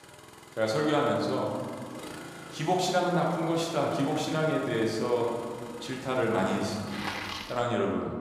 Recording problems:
room echo; noticeable; dies away in 1.8 s
off-mic speech; somewhat distant
traffic noise; noticeable; throughout; 15 dB below the speech

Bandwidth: 15 kHz